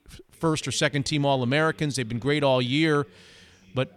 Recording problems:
voice in the background; faint; throughout; 25 dB below the speech

